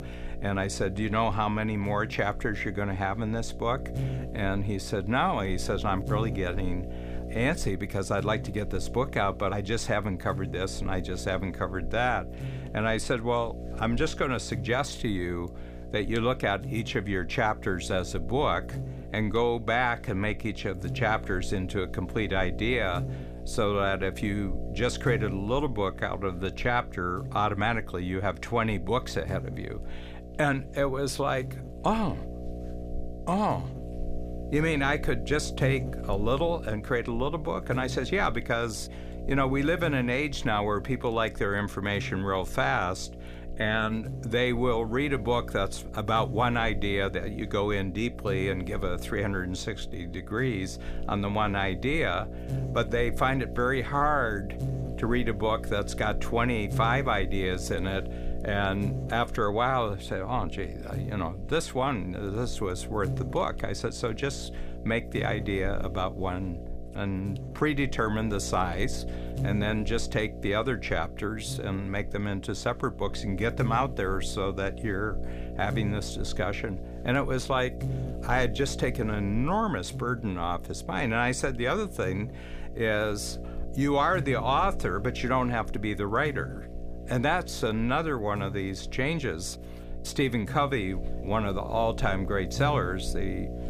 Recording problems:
electrical hum; noticeable; throughout; 60 Hz, 15 dB below the speech

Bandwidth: 15 kHz